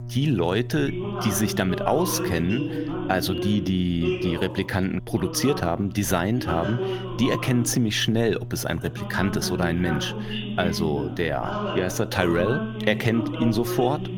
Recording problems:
voice in the background; loud; throughout; 6 dB below the speech
electrical hum; faint; throughout; 60 Hz, 20 dB below the speech

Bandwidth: 17 kHz